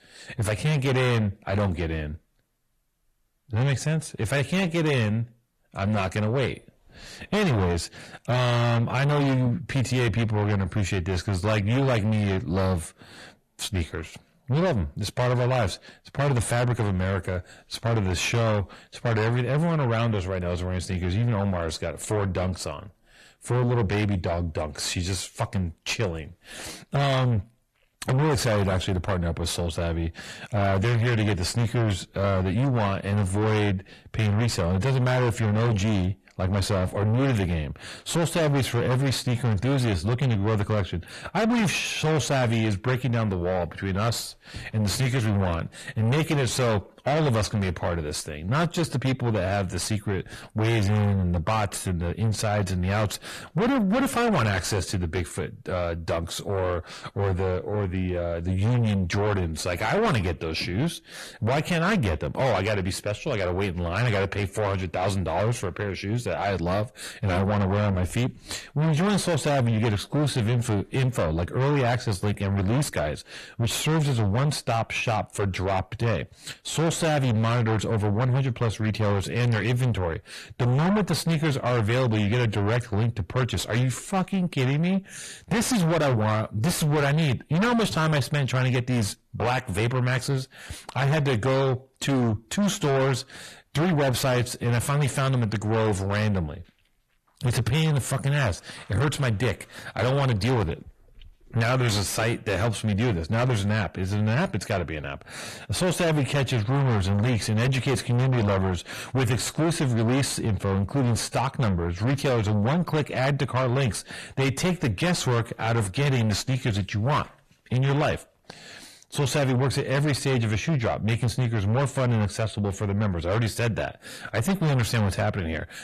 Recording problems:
distortion; heavy; 6 dB below the speech
garbled, watery; slightly; nothing above 13.5 kHz

